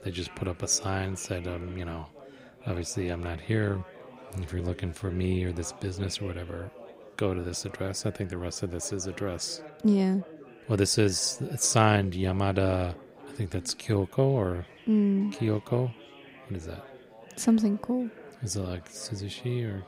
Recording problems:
chatter from many people; noticeable; throughout; 20 dB below the speech

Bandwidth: 15.5 kHz